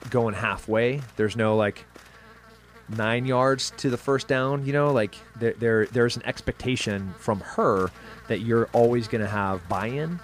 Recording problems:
electrical hum; faint; throughout; 60 Hz, 20 dB below the speech

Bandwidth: 15 kHz